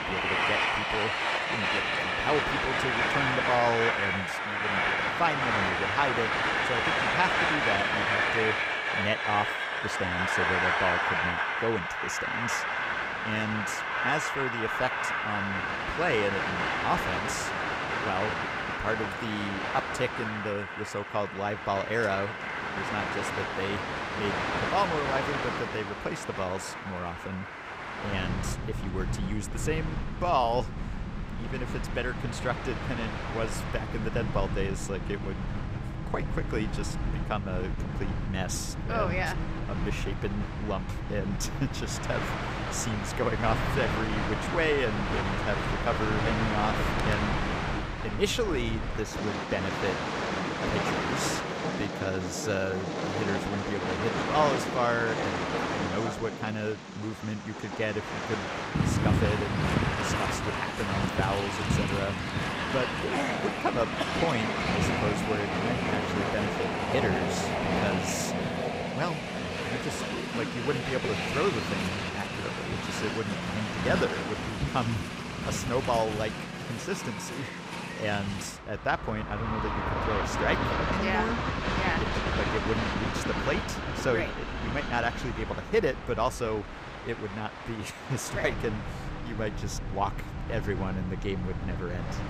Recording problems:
train or aircraft noise; very loud; throughout; 2 dB above the speech

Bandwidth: 15.5 kHz